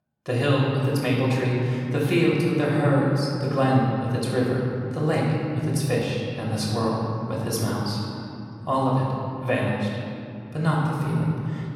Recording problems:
off-mic speech; far
room echo; noticeable; dies away in 2.7 s

